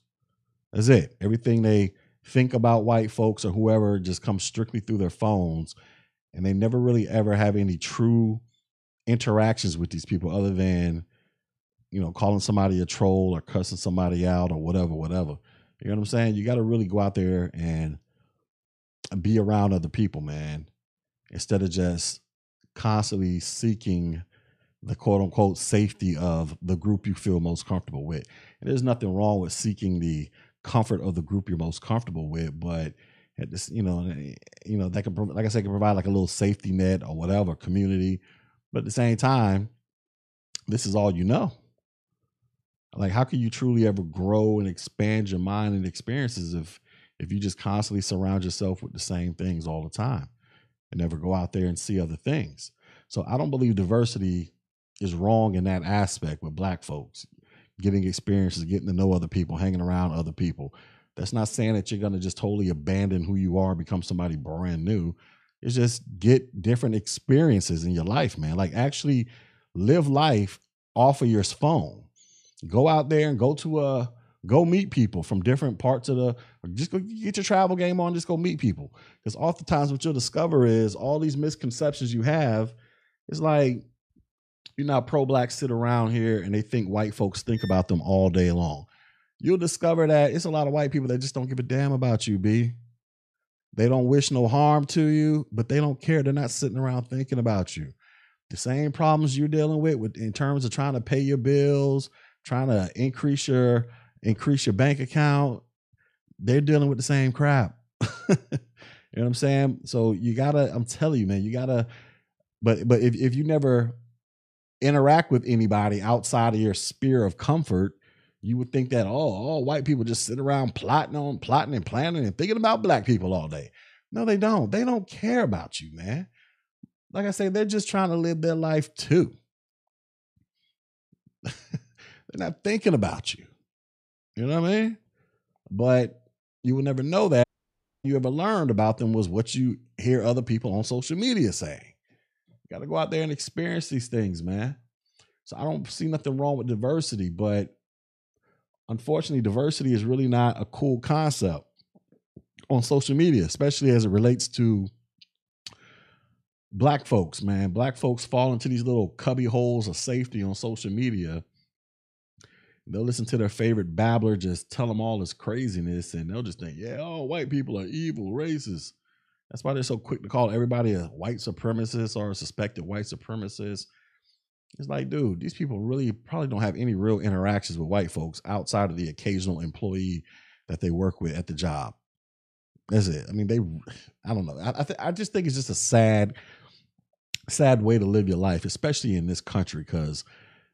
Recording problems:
audio cutting out; at 2:17 for 0.5 s

